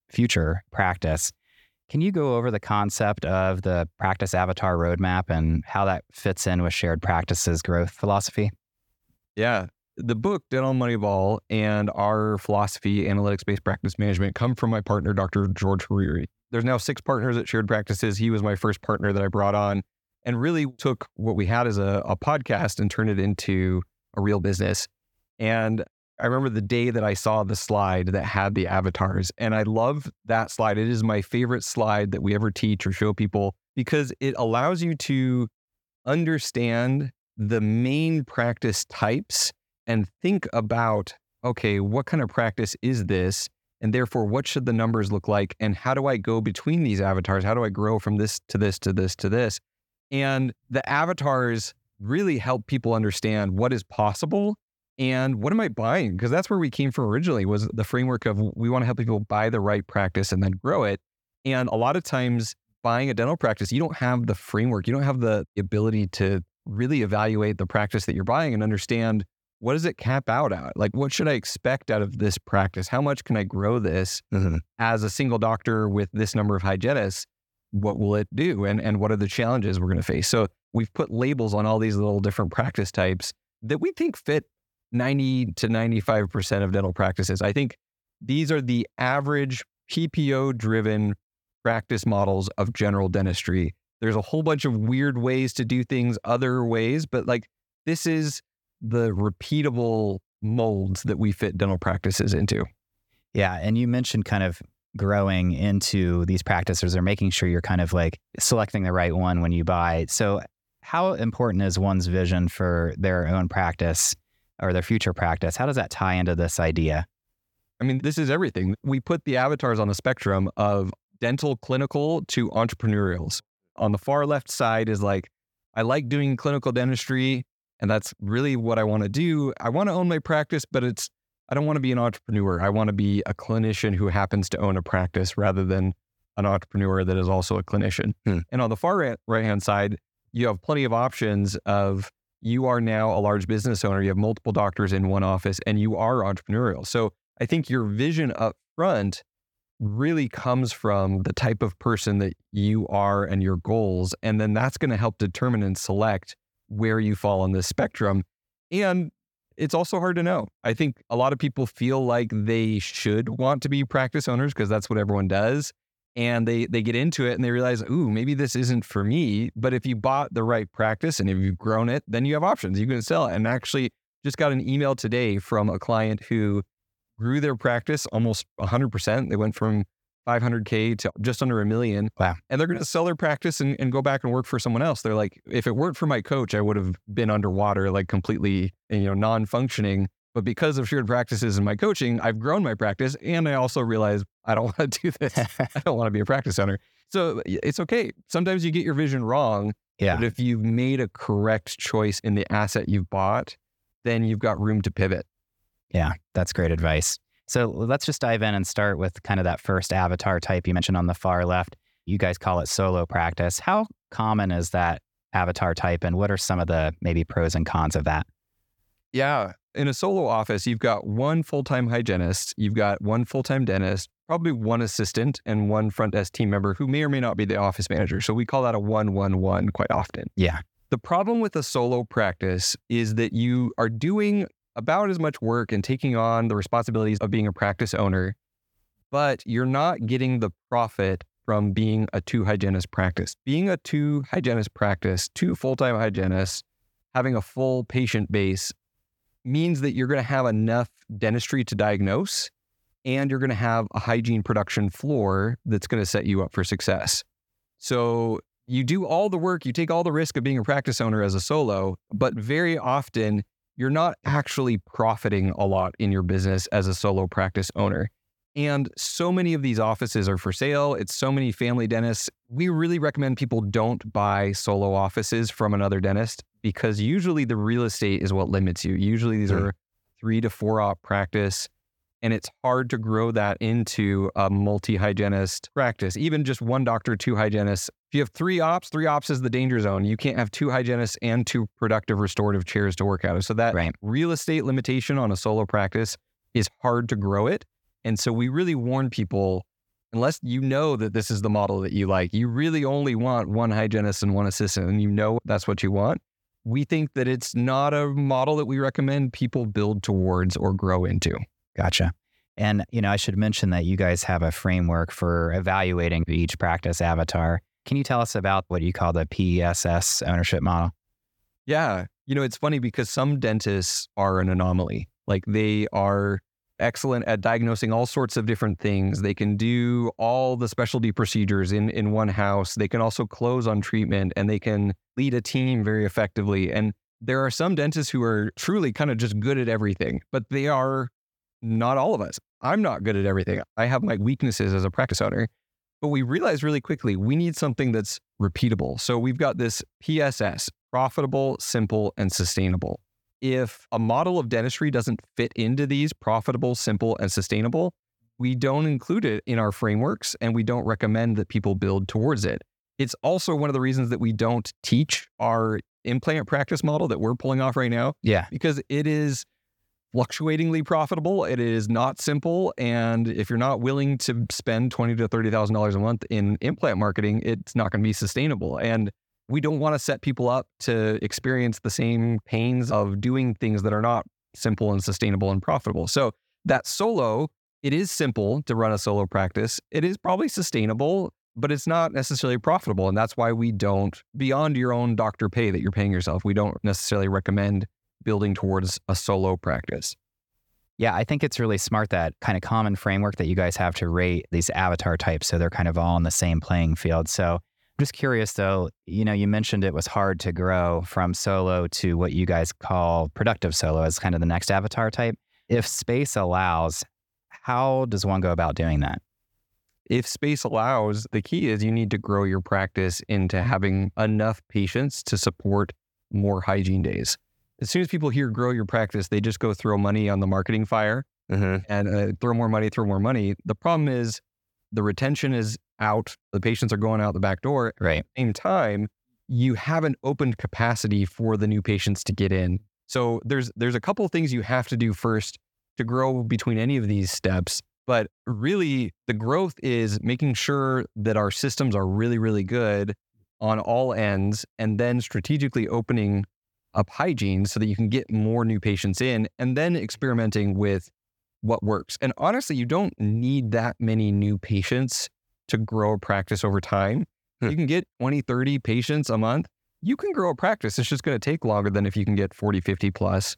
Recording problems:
uneven, jittery; strongly; from 10 s to 7:42

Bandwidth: 18 kHz